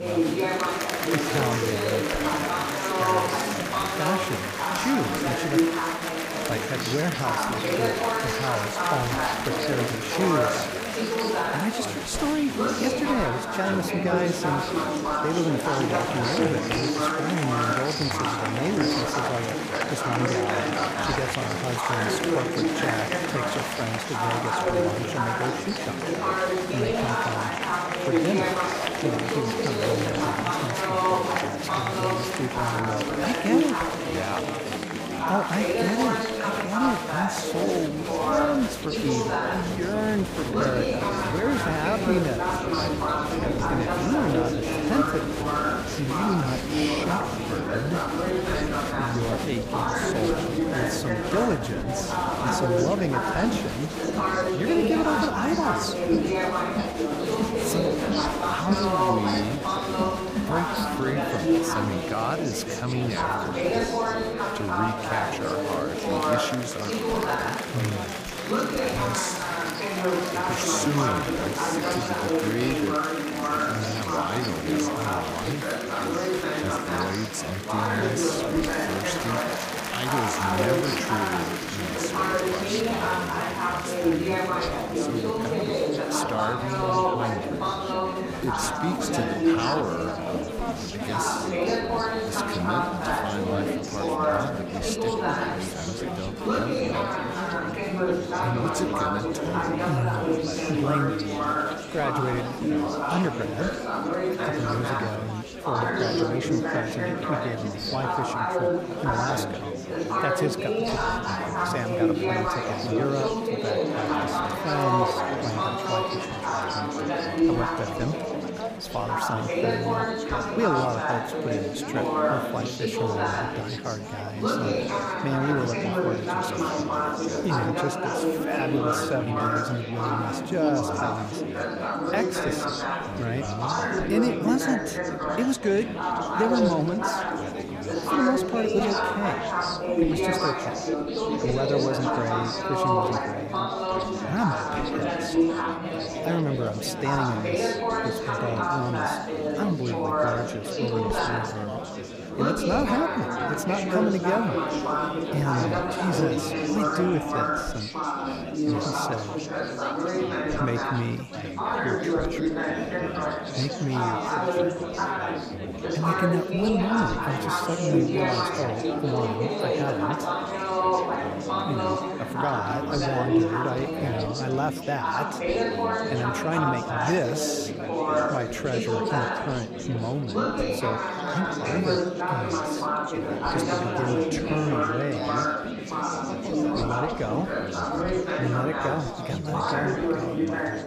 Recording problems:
chatter from many people; very loud; throughout; 4 dB above the speech

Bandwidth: 15 kHz